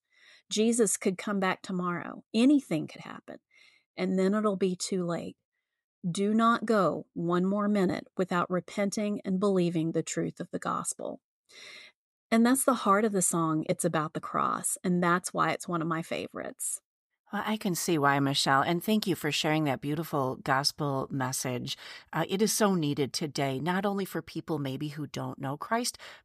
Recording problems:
none

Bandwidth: 14.5 kHz